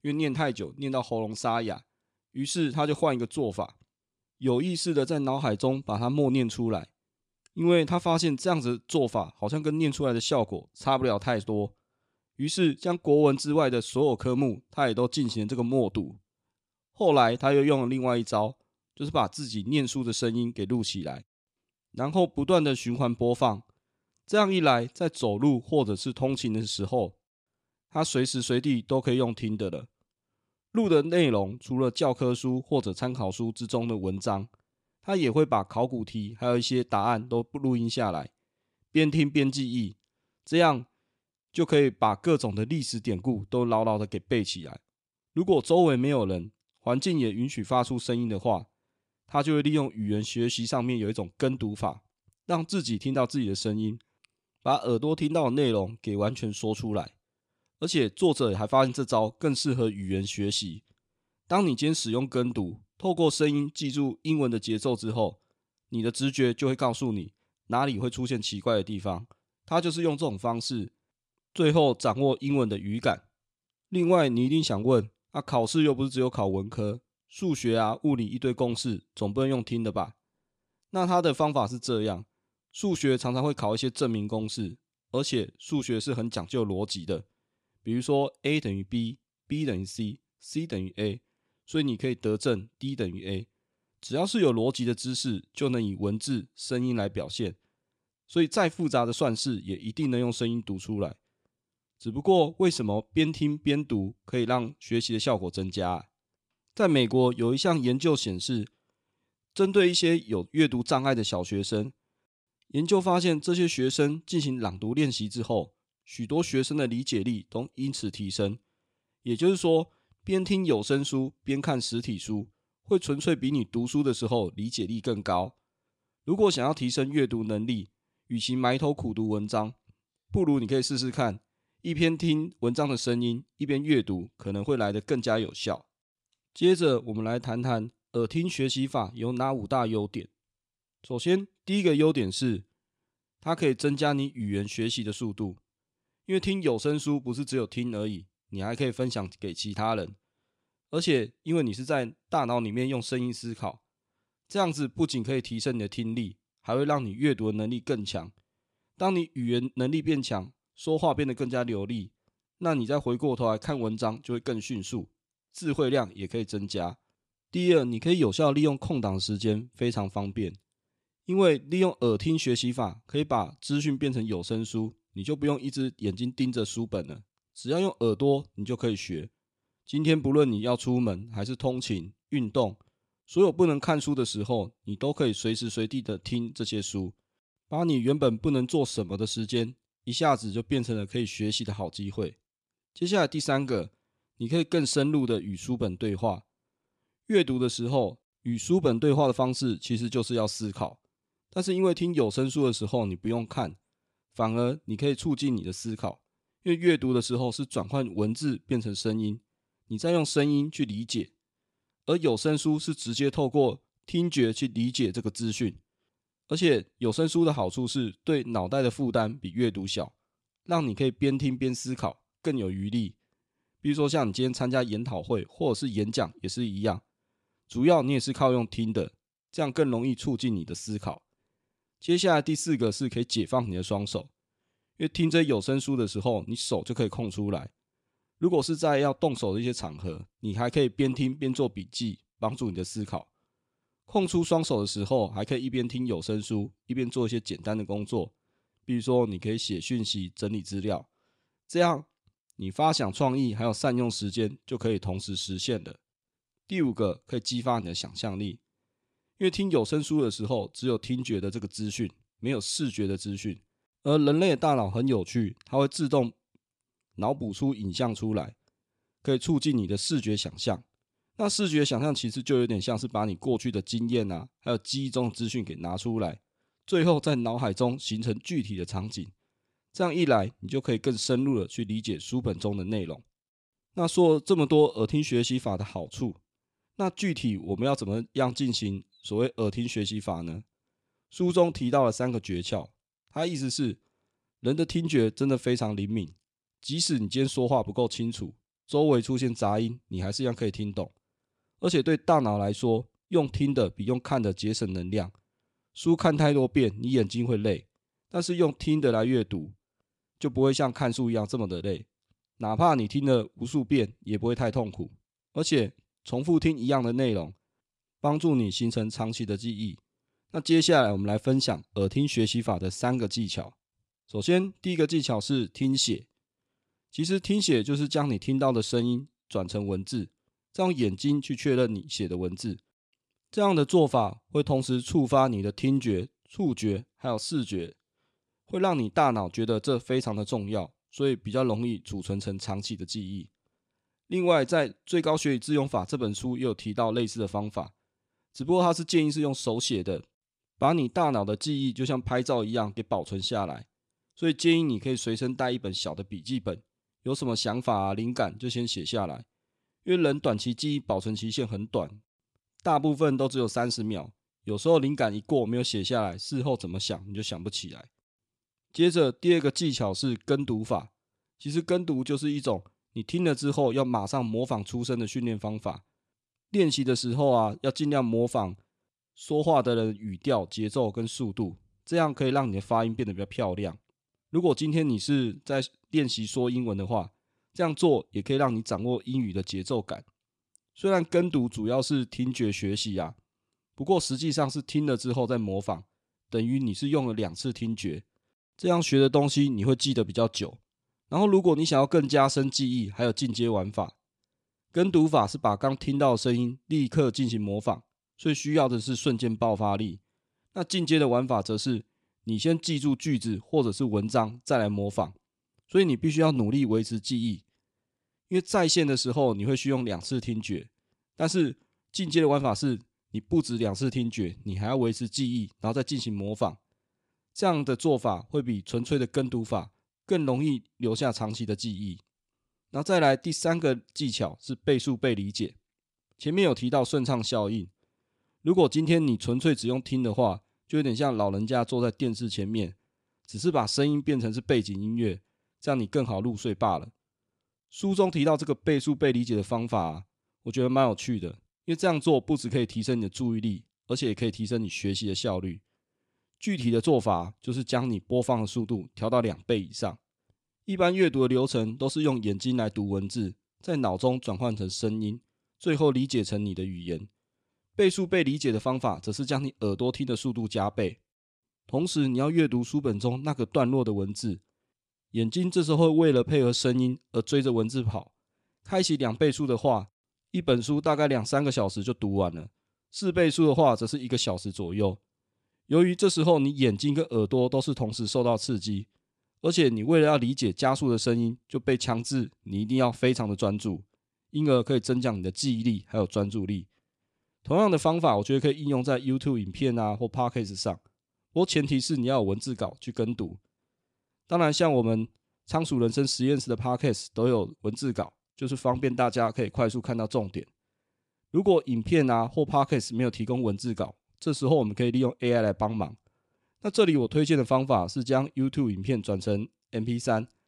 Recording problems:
none

